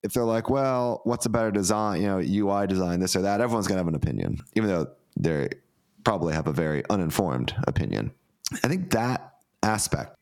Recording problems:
squashed, flat; heavily

